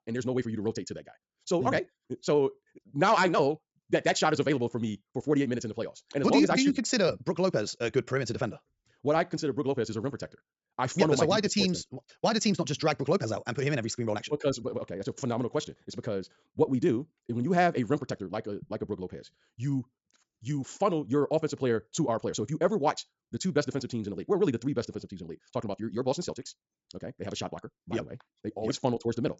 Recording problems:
wrong speed, natural pitch; too fast; 1.8 times normal speed
high frequencies cut off; noticeable; nothing above 8 kHz

